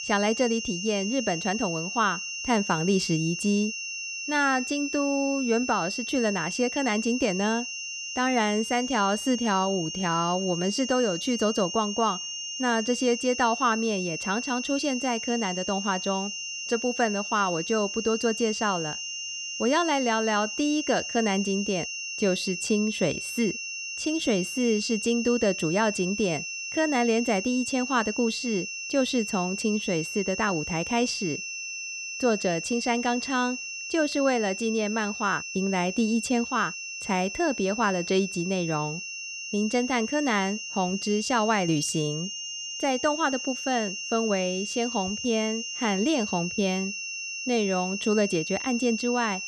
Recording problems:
high-pitched whine; loud; throughout; 2.5 kHz, 5 dB below the speech

